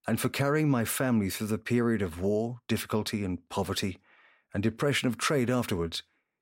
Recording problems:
none

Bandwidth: 16 kHz